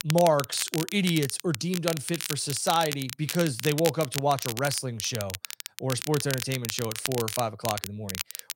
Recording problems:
crackle, like an old record; loud; 6 dB below the speech

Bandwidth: 16 kHz